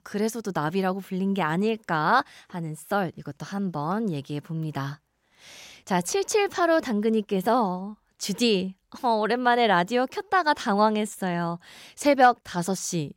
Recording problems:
none

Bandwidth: 16 kHz